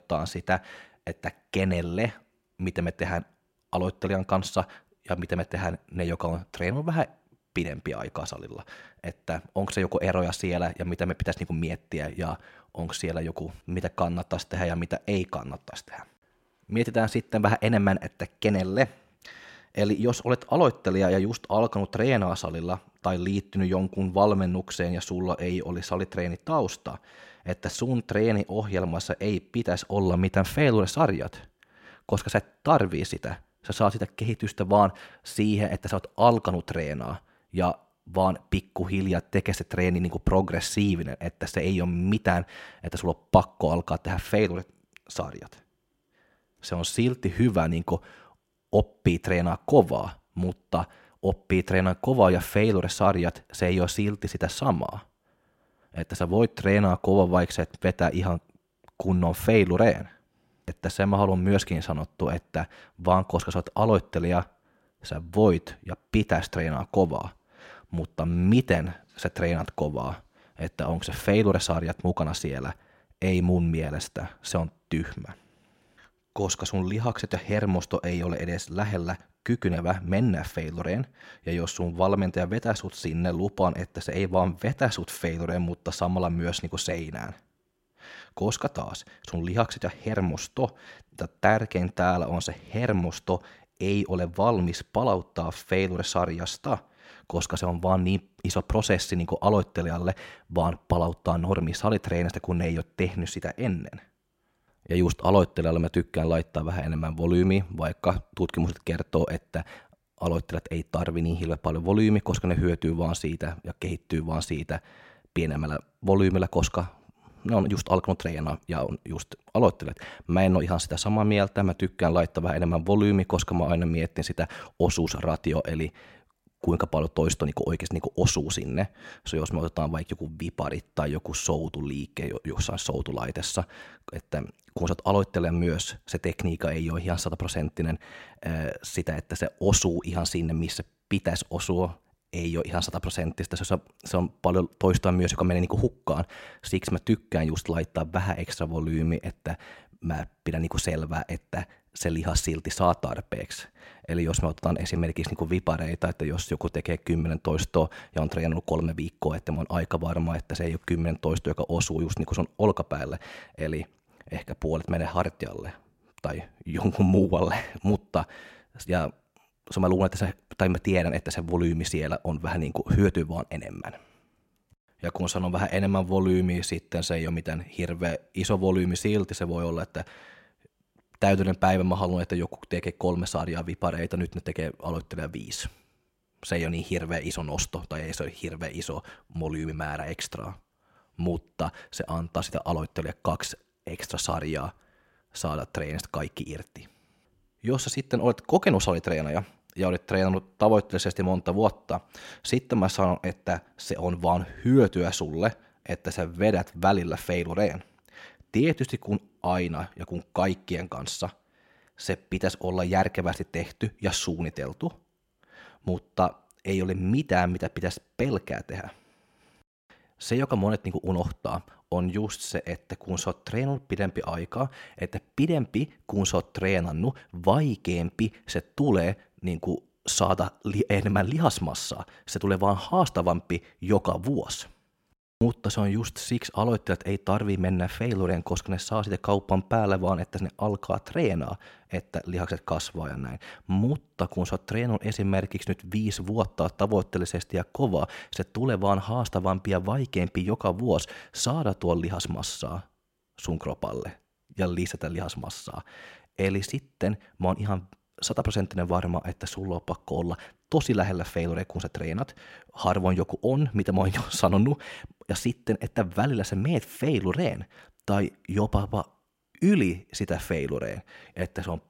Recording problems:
none

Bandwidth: 16 kHz